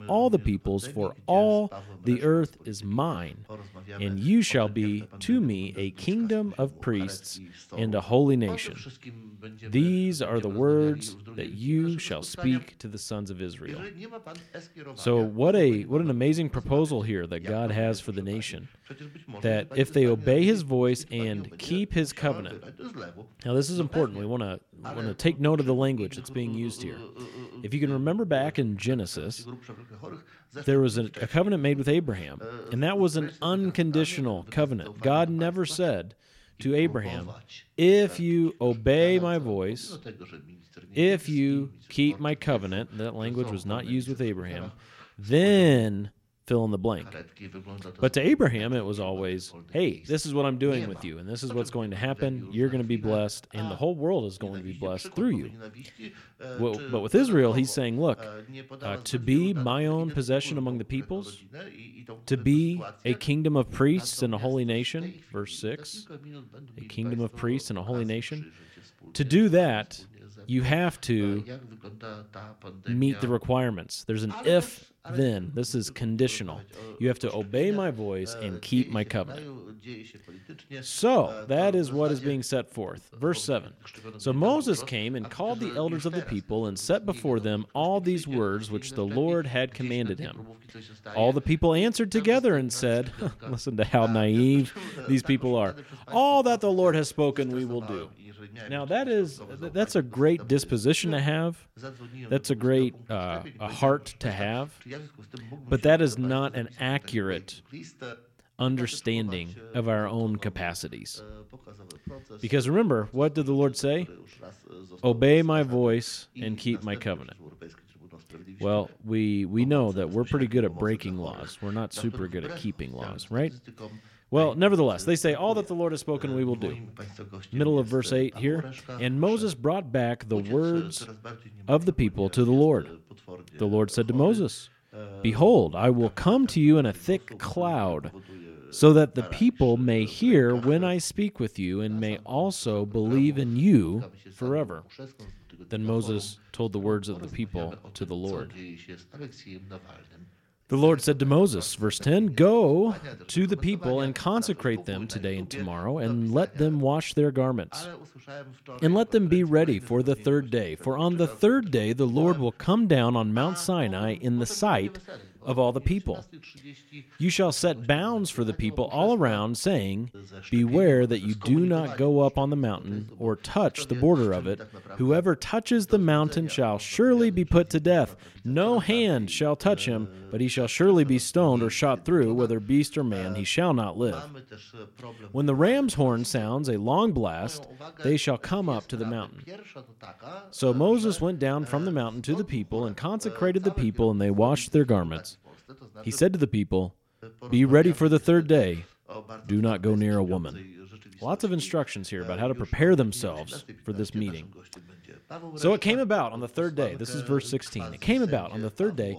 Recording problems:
voice in the background; noticeable; throughout; 20 dB below the speech

